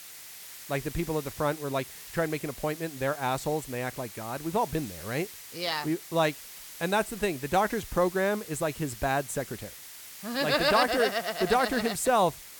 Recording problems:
hiss; noticeable; throughout; 15 dB below the speech

